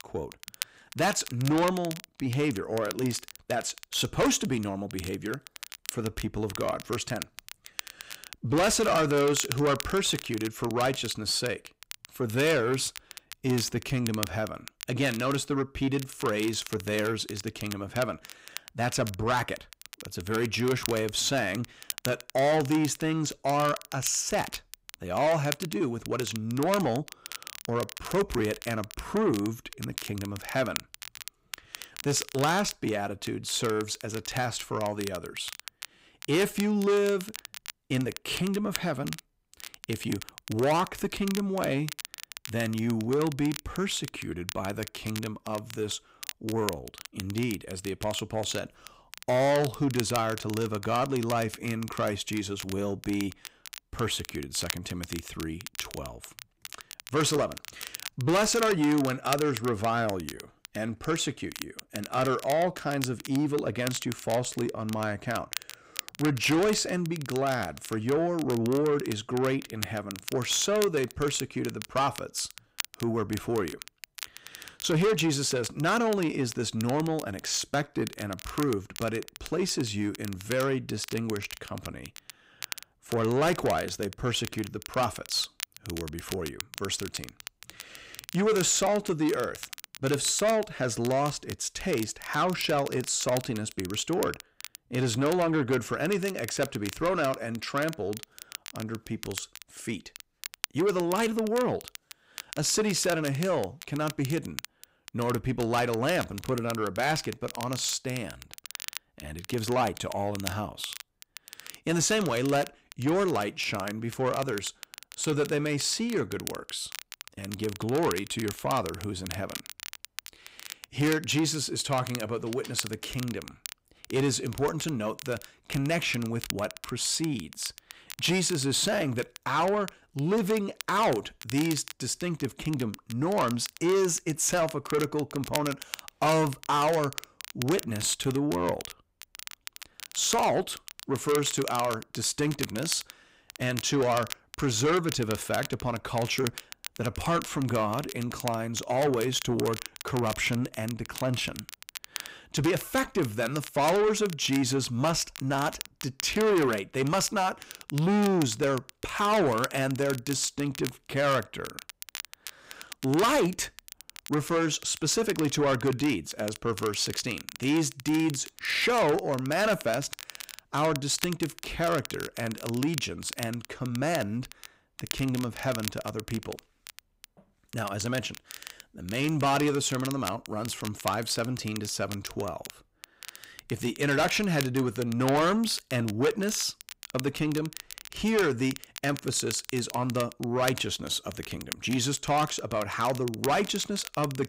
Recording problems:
distortion; heavy; 8 dB below the speech
crackle, like an old record; noticeable; 15 dB below the speech

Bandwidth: 15.5 kHz